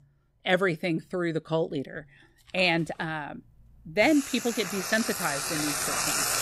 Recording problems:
household noises; loud; throughout; 2 dB below the speech

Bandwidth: 15.5 kHz